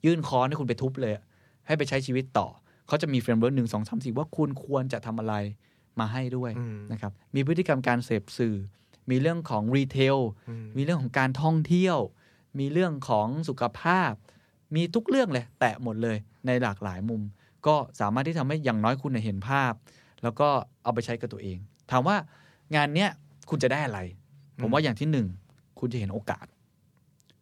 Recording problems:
none

